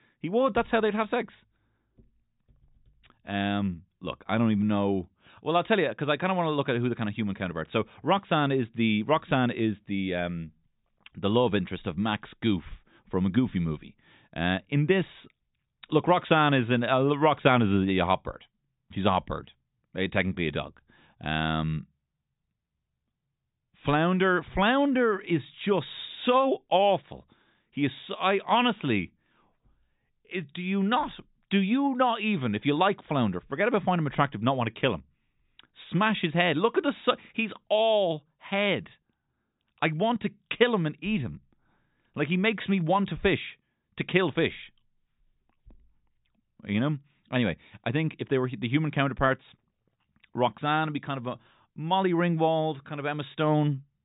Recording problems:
high frequencies cut off; severe; nothing above 4 kHz

